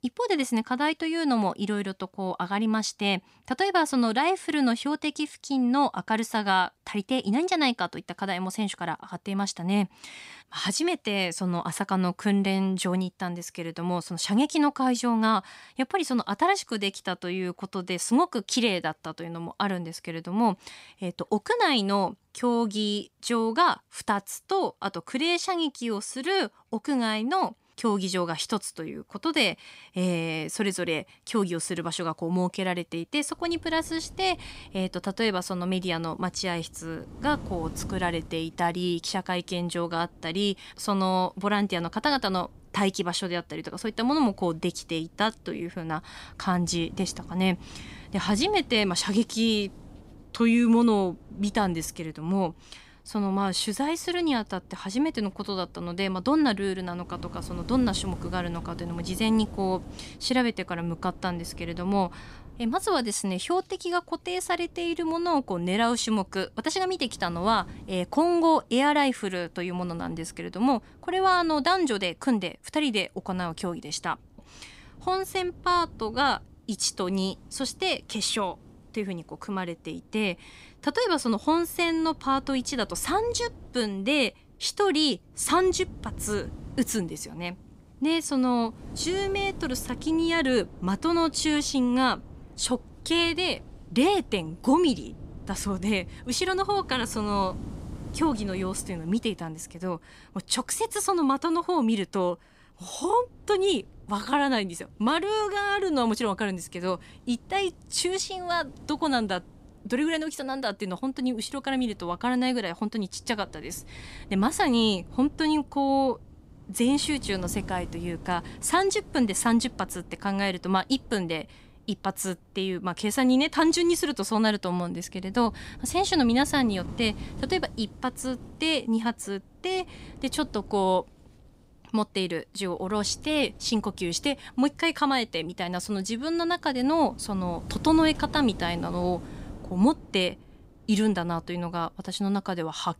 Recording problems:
wind noise on the microphone; occasional gusts; from 33 s on; 25 dB below the speech

